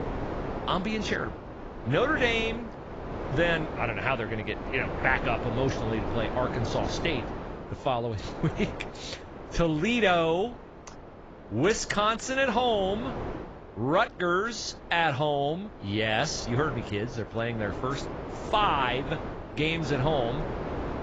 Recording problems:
garbled, watery; badly; nothing above 7.5 kHz
wind noise on the microphone; occasional gusts; 10 dB below the speech

